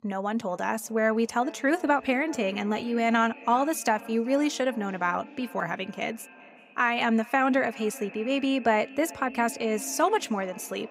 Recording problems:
echo of what is said; faint; throughout; 380 ms later, 20 dB below the speech

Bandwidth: 15.5 kHz